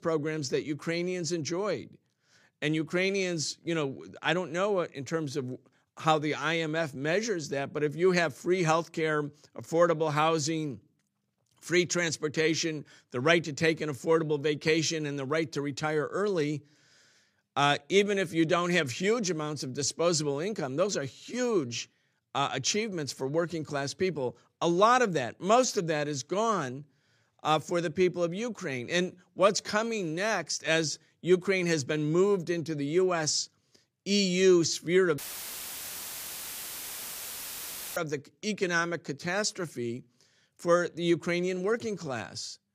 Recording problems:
audio cutting out; filled with static; at 35 s for 3 s

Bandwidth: 15 kHz